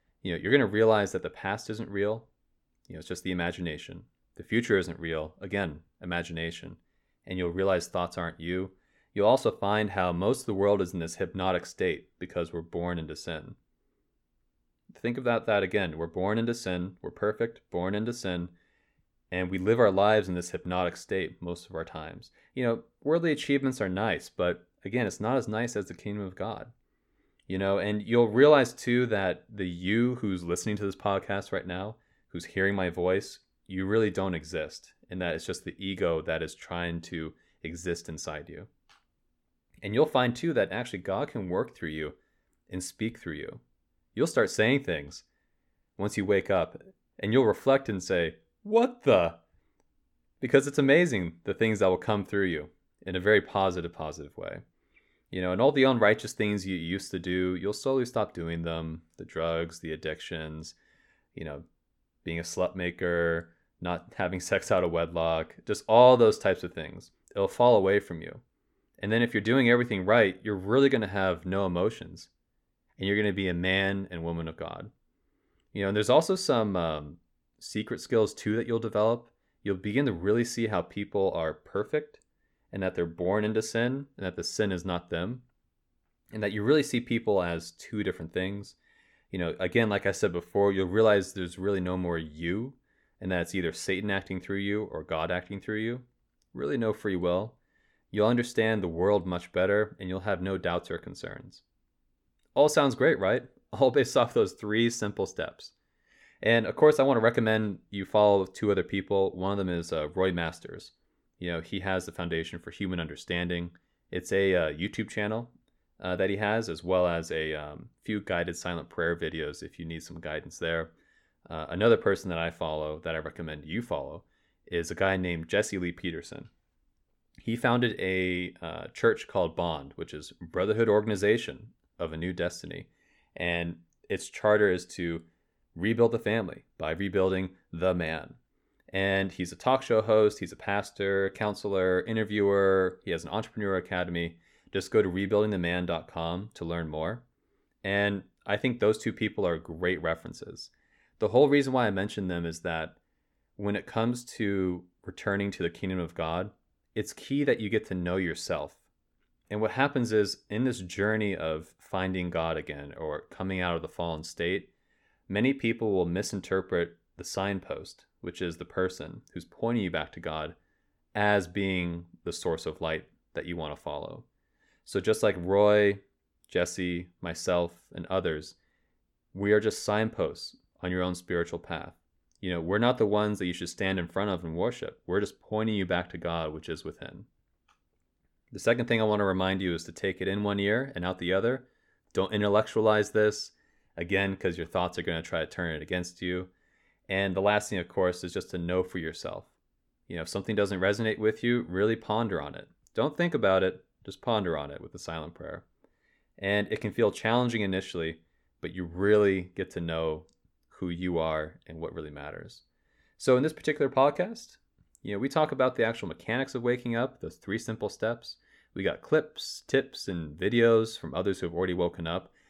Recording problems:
none

